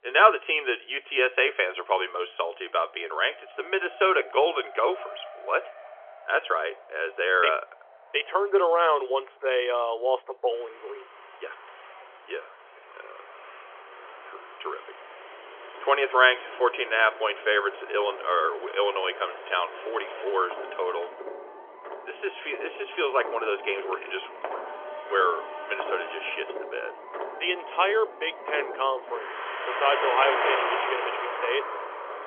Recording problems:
phone-call audio; nothing above 3.5 kHz
traffic noise; loud; throughout; 9 dB below the speech

